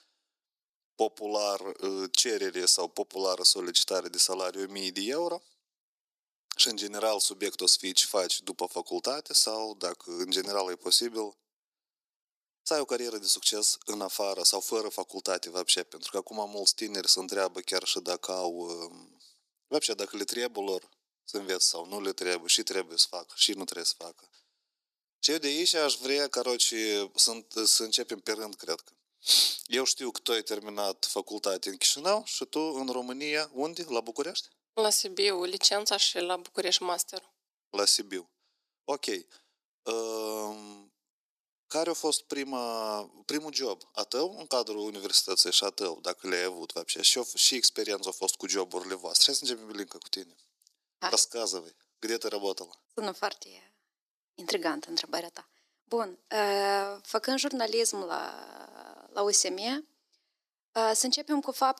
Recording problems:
thin; very; fading below 350 Hz

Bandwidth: 14.5 kHz